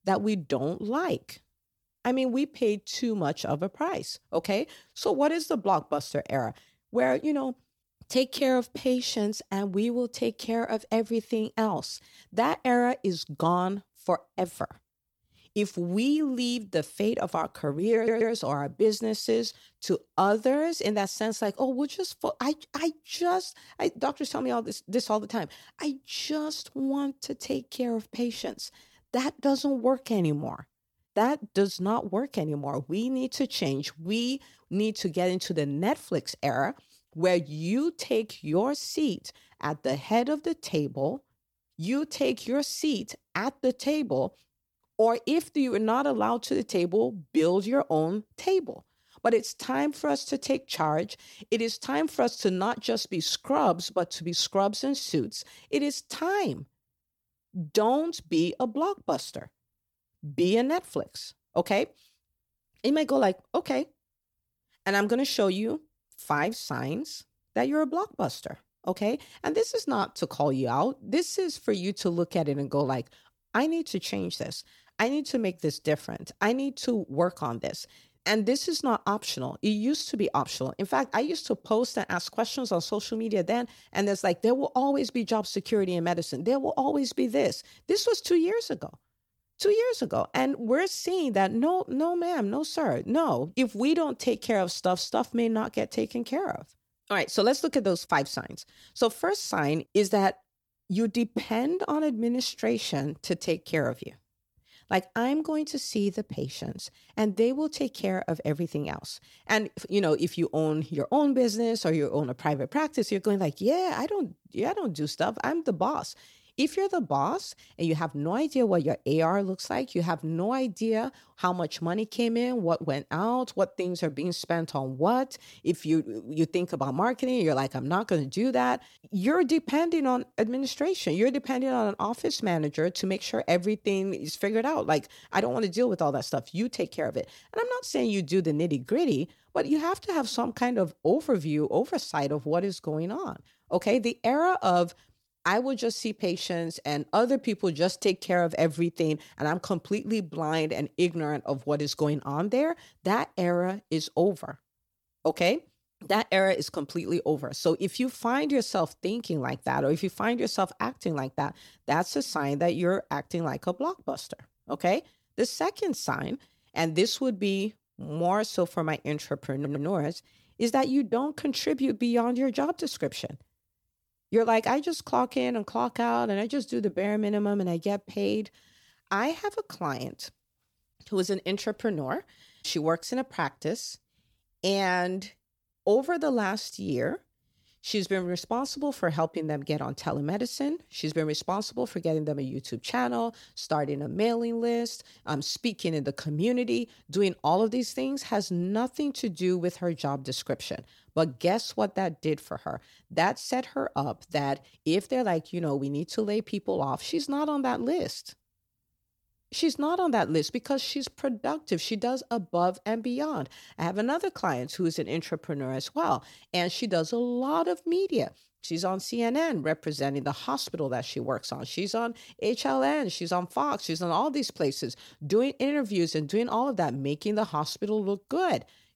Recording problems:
audio stuttering; at 18 s and at 2:50

